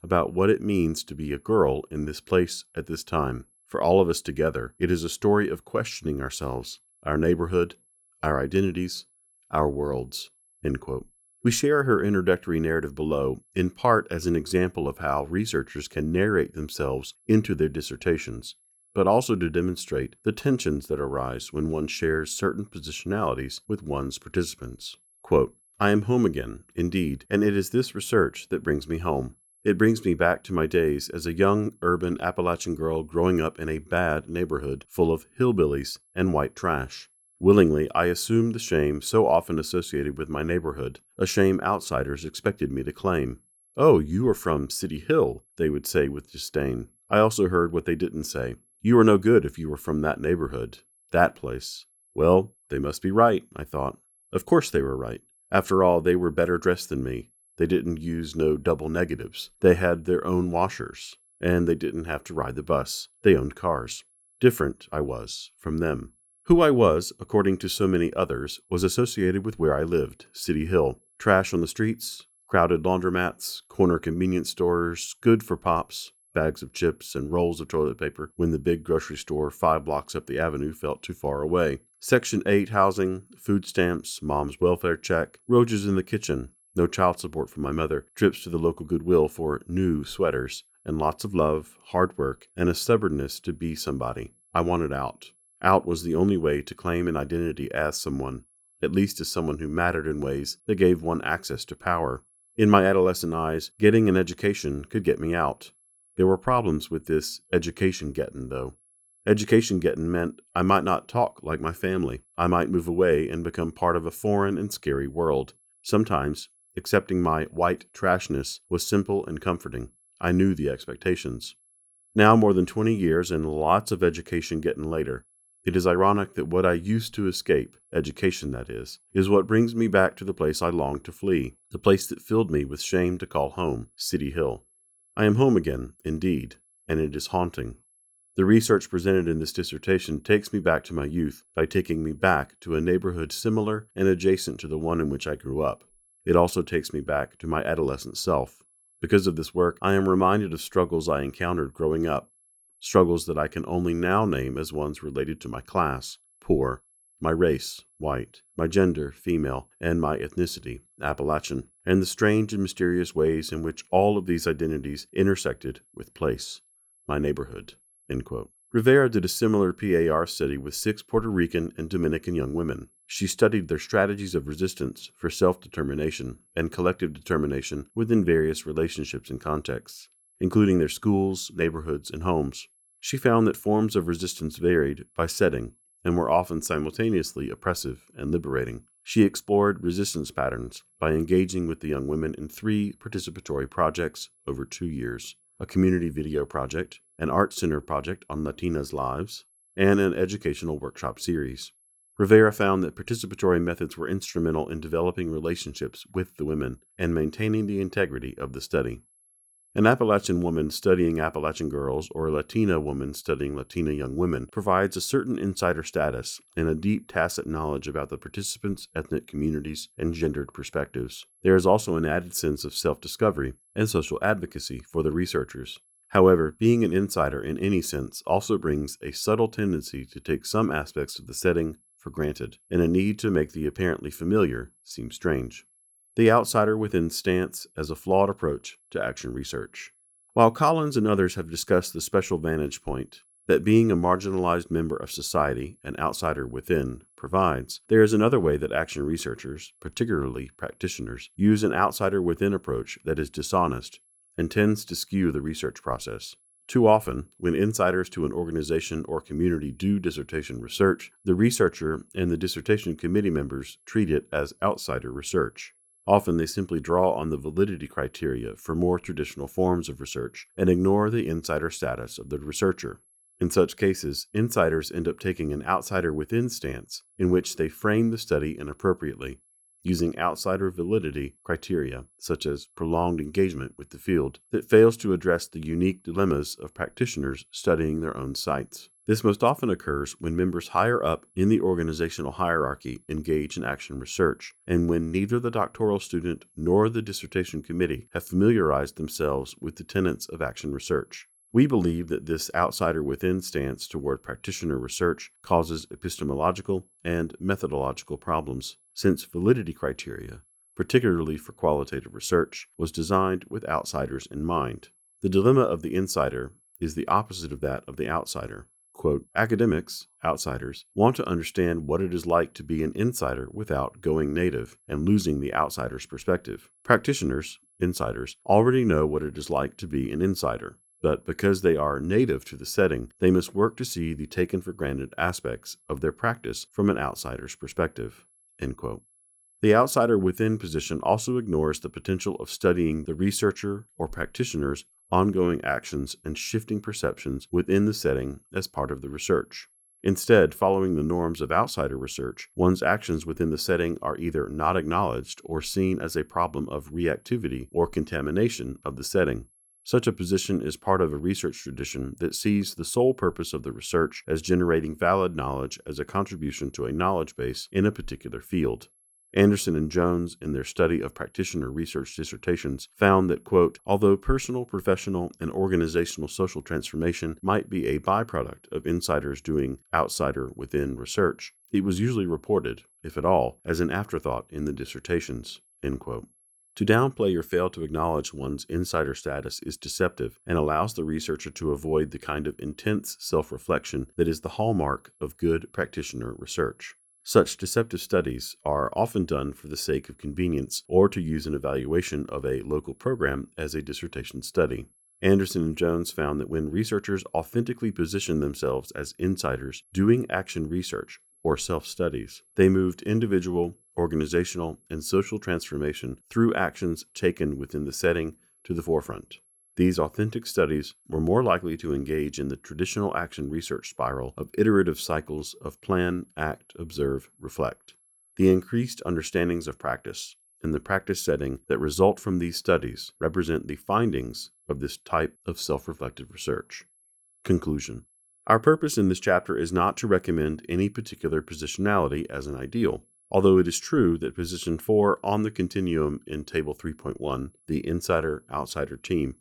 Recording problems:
high-pitched whine; faint; throughout; 11 kHz, 35 dB below the speech

